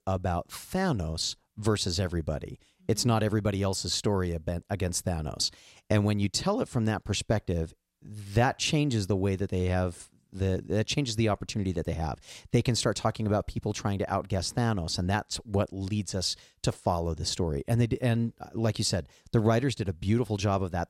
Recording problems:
none

